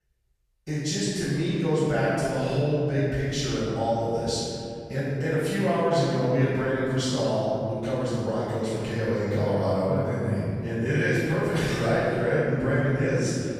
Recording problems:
room echo; strong; dies away in 2.5 s
off-mic speech; far

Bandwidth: 14.5 kHz